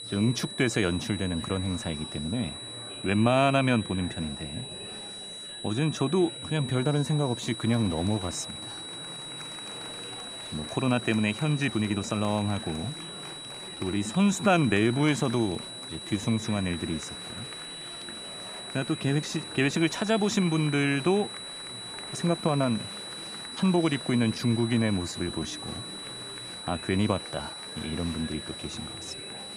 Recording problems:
high-pitched whine; loud; throughout; 4 kHz, 10 dB below the speech
murmuring crowd; noticeable; throughout; 15 dB below the speech
uneven, jittery; strongly; from 3 to 28 s

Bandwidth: 15 kHz